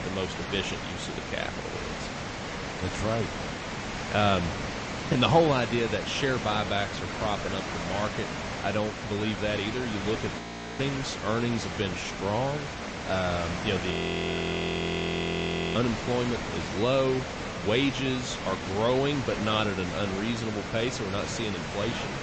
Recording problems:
echo of what is said; noticeable; from 6.5 s on; 570 ms later, 15 dB below the speech
garbled, watery; slightly; nothing above 8 kHz
high frequencies cut off; slight
hiss; loud; throughout; 5 dB below the speech
audio freezing; at 10 s and at 14 s for 2 s

